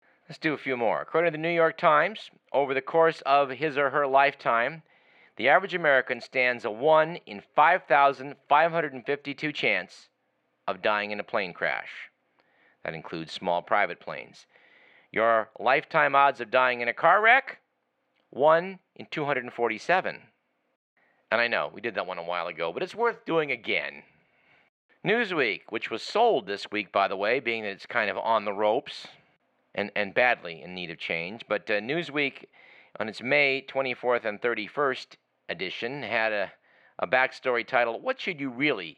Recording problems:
muffled; slightly; fading above 3 kHz
thin; somewhat; fading below 450 Hz

